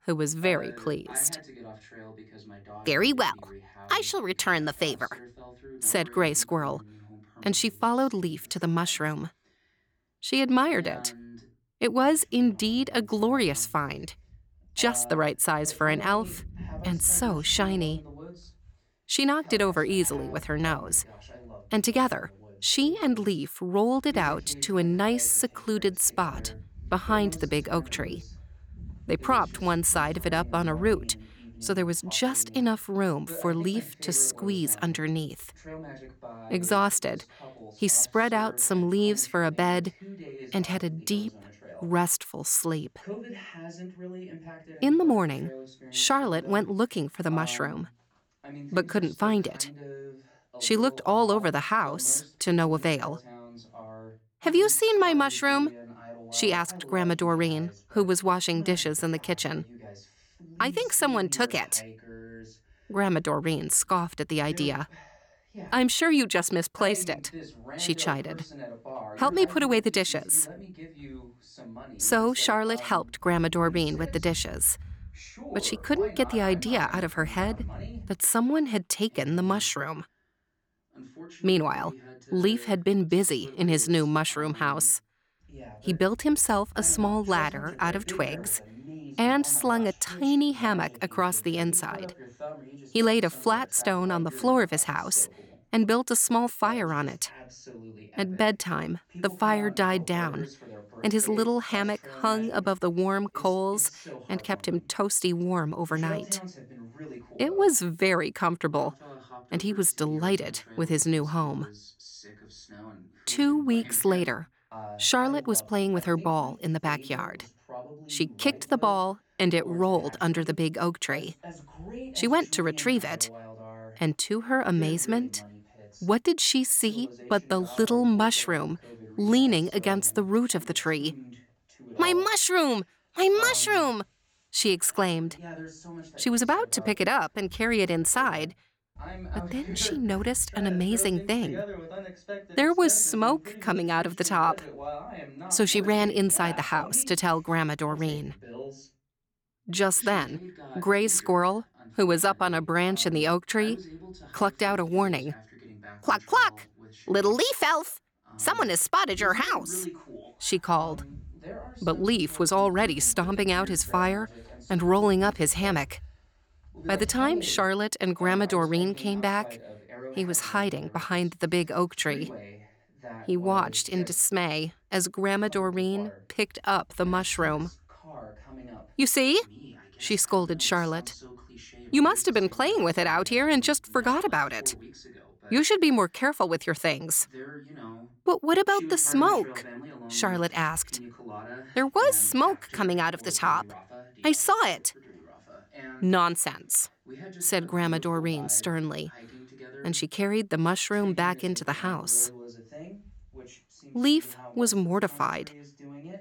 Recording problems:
voice in the background; noticeable; throughout; 20 dB below the speech

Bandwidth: 18.5 kHz